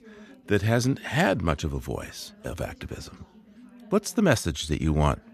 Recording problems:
background chatter; faint; throughout; 2 voices, 25 dB below the speech

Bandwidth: 14 kHz